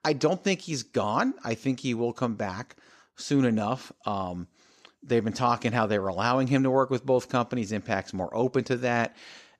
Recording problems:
none

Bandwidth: 14.5 kHz